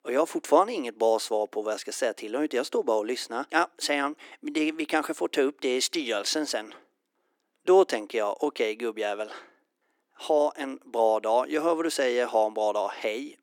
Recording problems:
thin; very; fading below 300 Hz

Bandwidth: 17 kHz